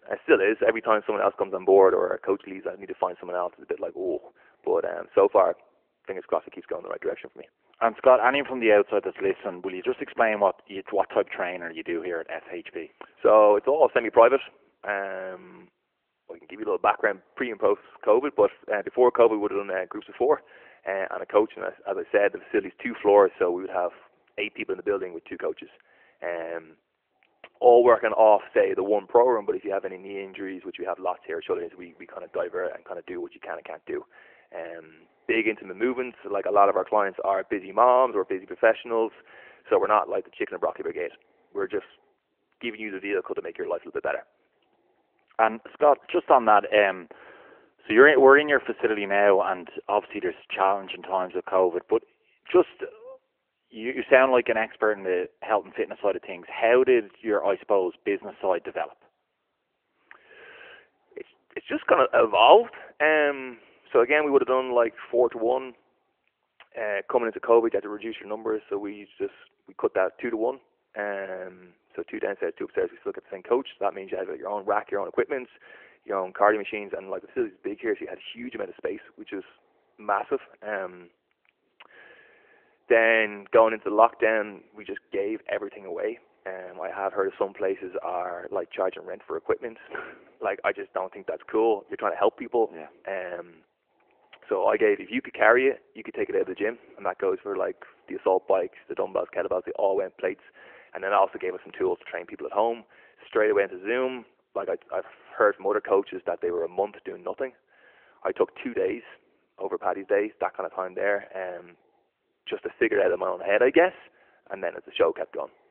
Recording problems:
phone-call audio; nothing above 3 kHz

